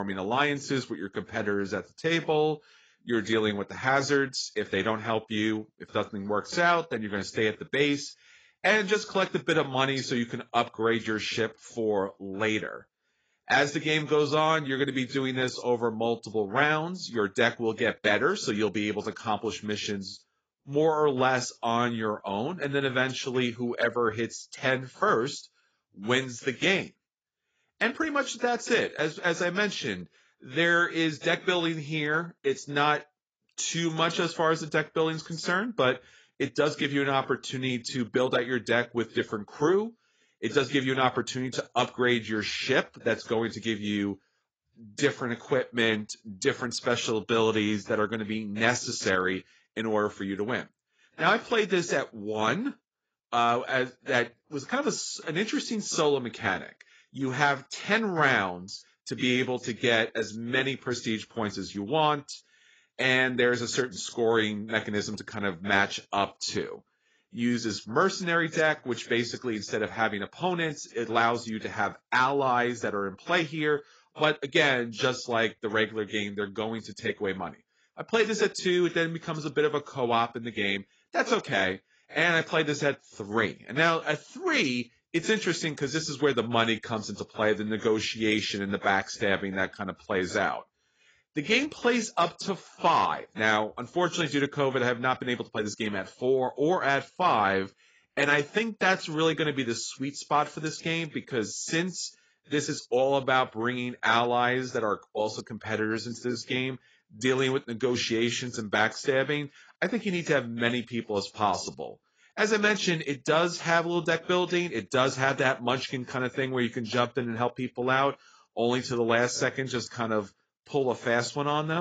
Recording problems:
garbled, watery; badly; nothing above 7.5 kHz
abrupt cut into speech; at the start and the end

